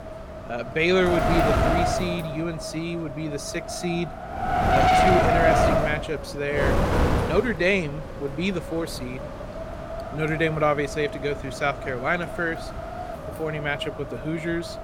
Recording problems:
wind noise on the microphone; heavy; 2 dB above the speech

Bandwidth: 16.5 kHz